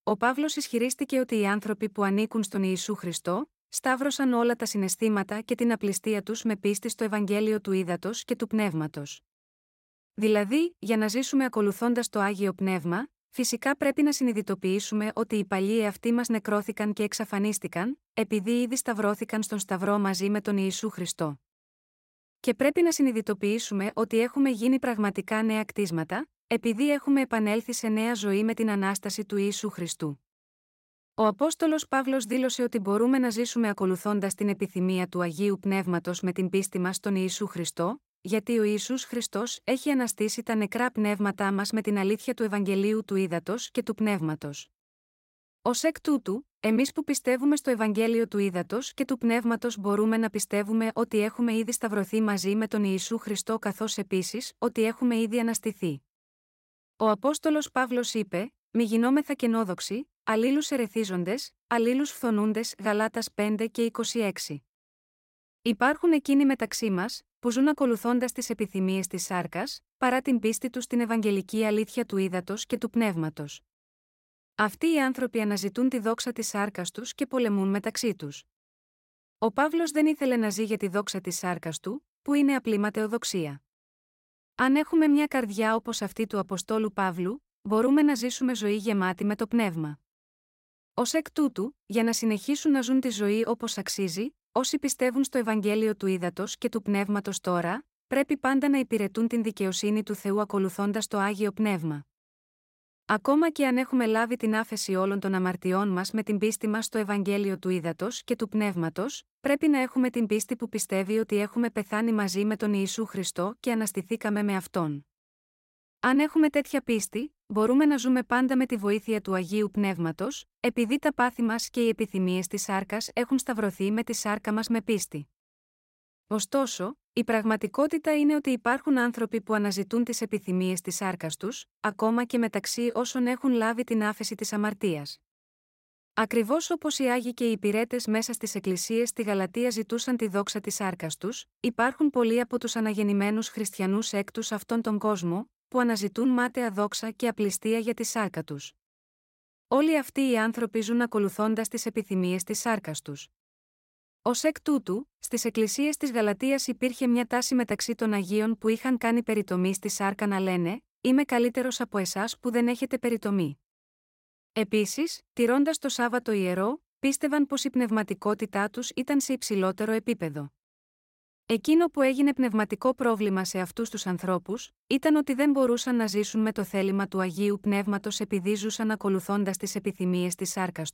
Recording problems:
none

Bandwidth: 16 kHz